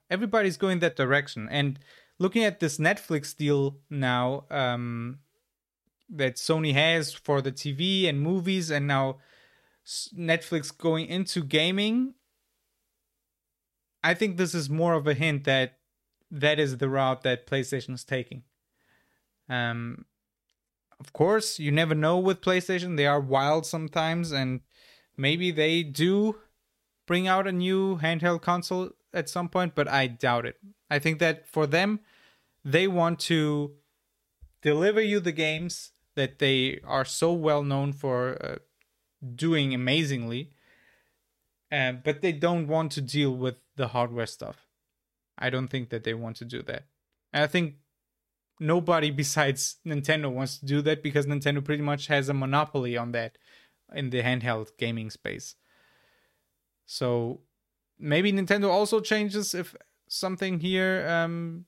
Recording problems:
none

